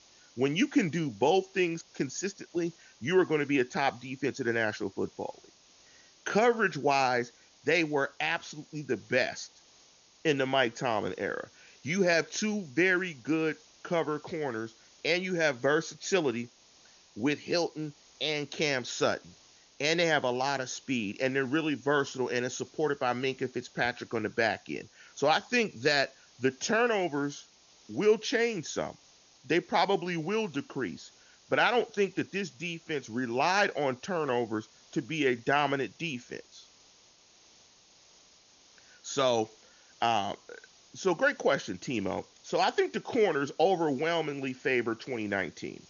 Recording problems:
high frequencies cut off; noticeable; nothing above 7 kHz
hiss; faint; throughout; 25 dB below the speech

